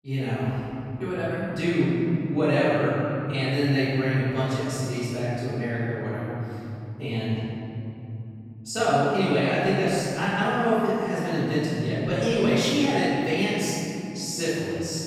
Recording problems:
room echo; strong; dies away in 3 s
off-mic speech; far

